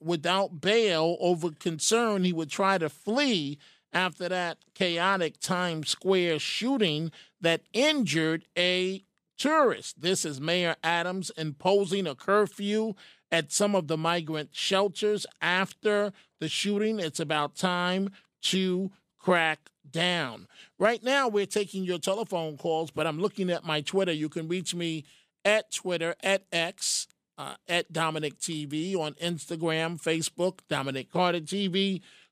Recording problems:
none

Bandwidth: 14.5 kHz